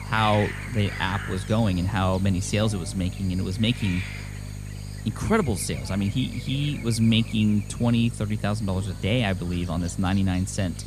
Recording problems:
electrical hum; noticeable; throughout; 50 Hz, 15 dB below the speech
animal sounds; noticeable; throughout; 15 dB below the speech

